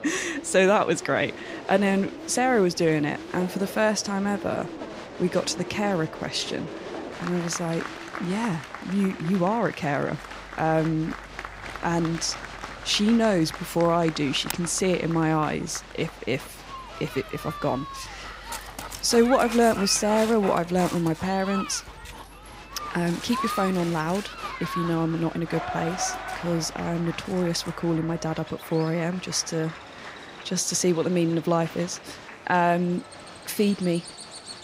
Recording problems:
animal sounds; noticeable; throughout; 15 dB below the speech
crowd noise; noticeable; throughout; 15 dB below the speech

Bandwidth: 15.5 kHz